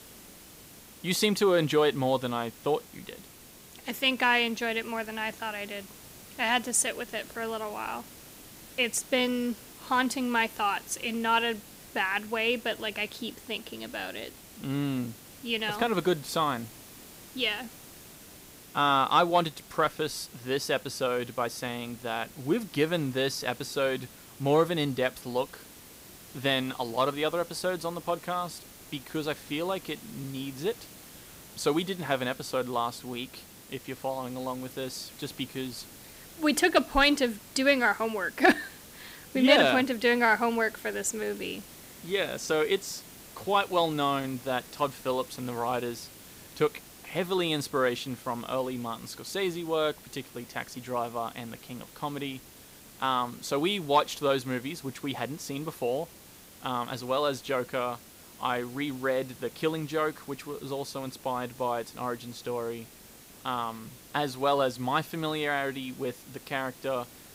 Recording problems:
hiss; noticeable; throughout; 20 dB below the speech

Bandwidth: 15.5 kHz